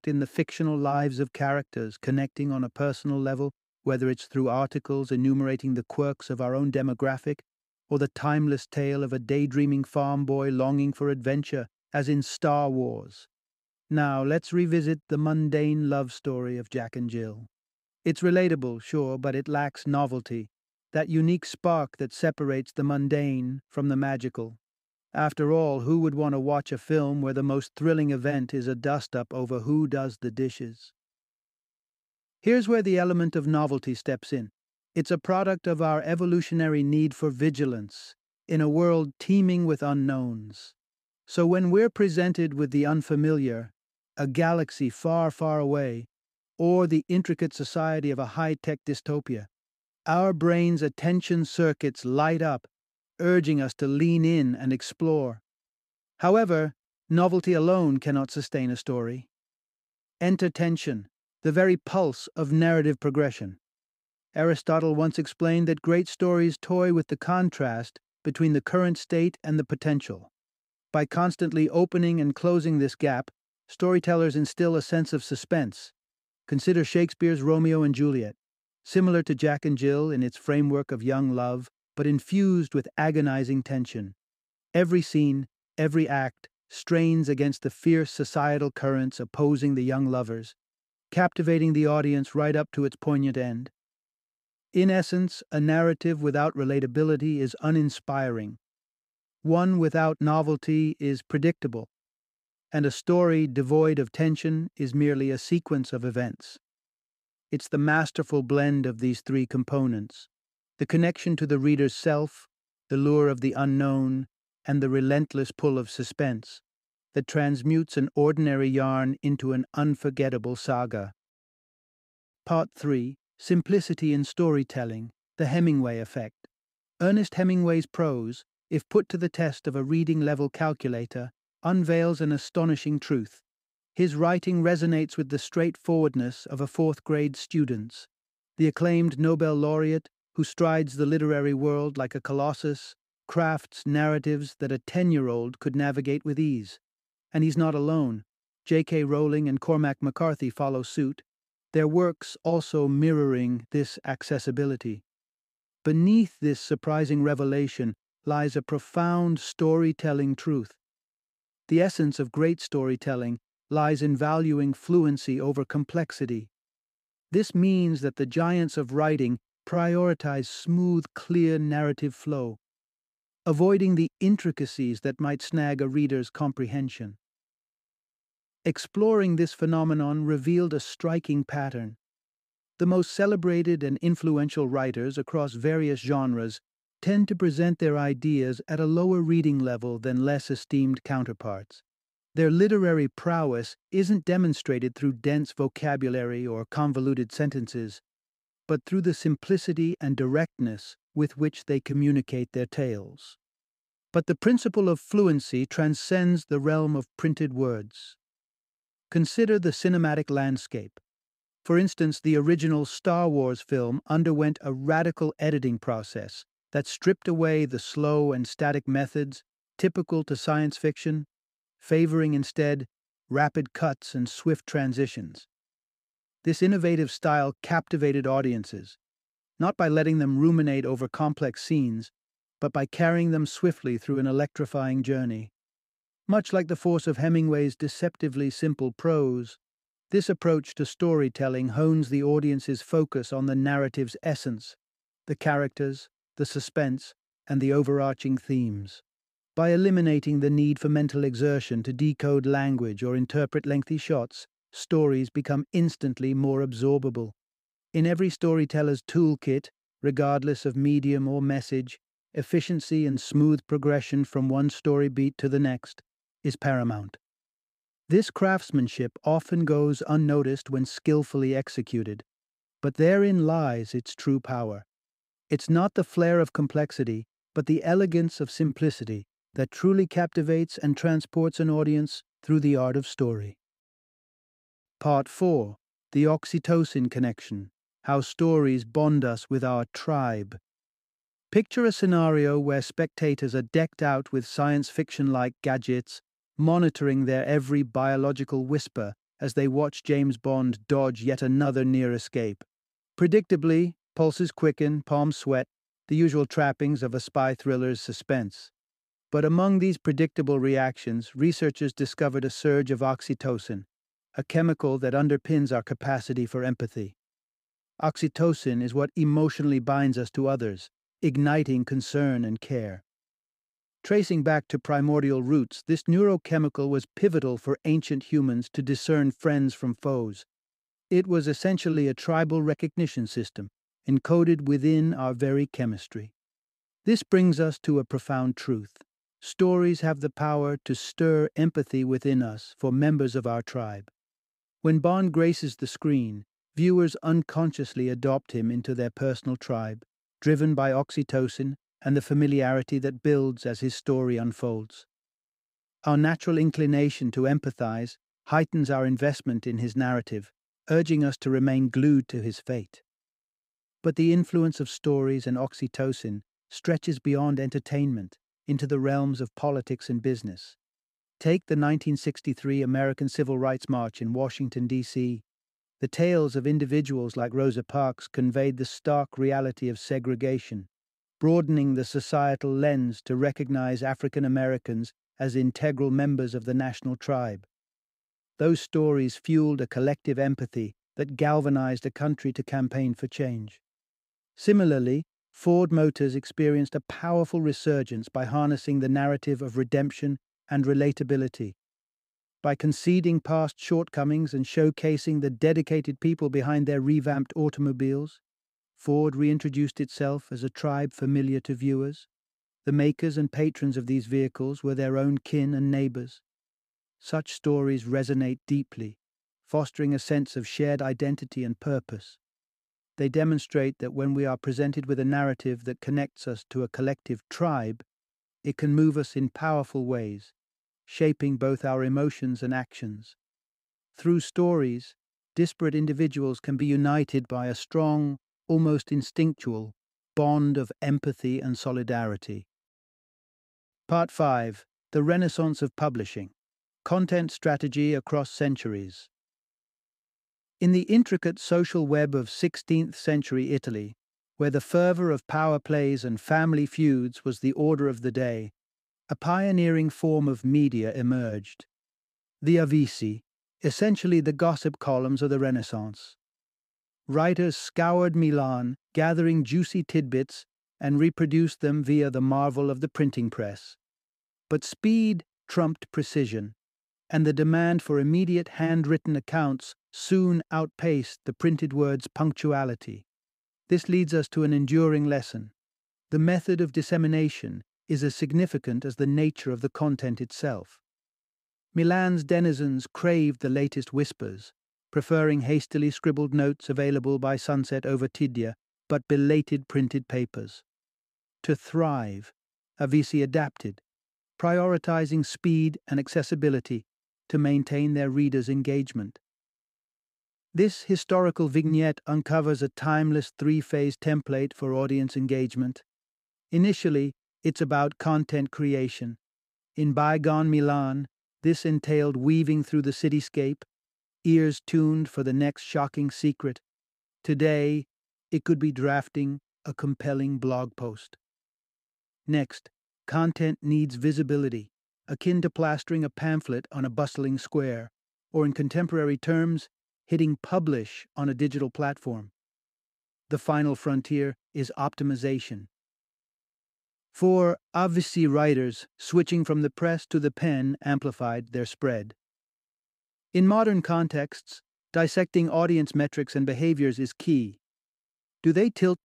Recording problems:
none

